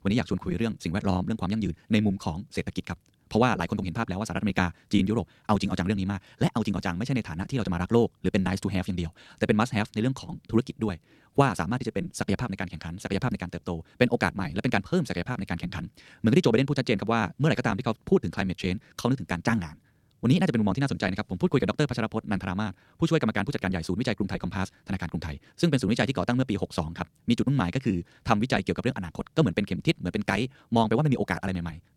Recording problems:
wrong speed, natural pitch; too fast; 1.7 times normal speed

